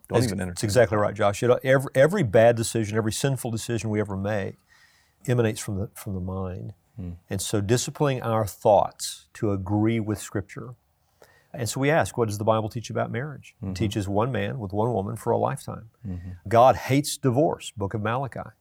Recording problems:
none

